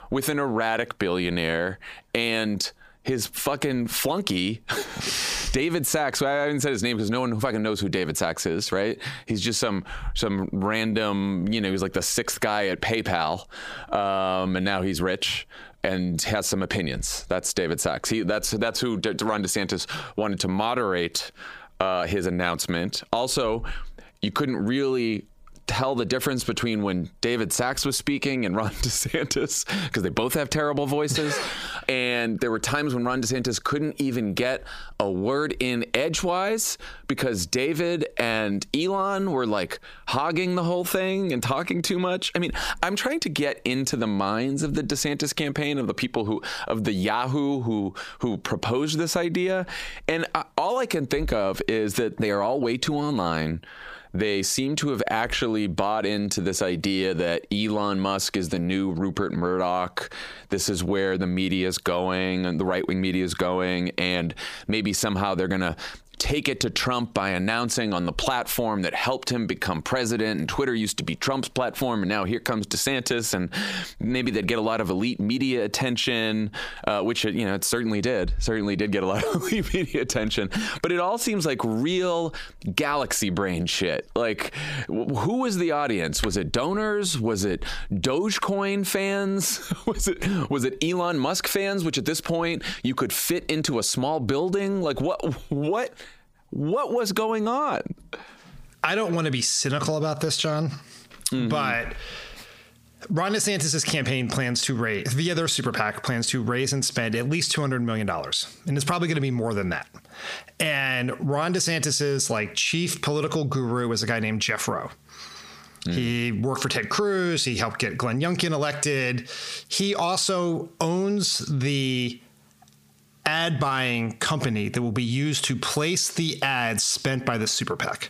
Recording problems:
squashed, flat; heavily

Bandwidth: 15 kHz